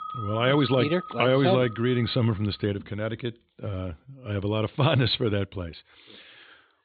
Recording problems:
high frequencies cut off; severe; nothing above 4.5 kHz
background music; noticeable; until 2.5 s; 15 dB below the speech

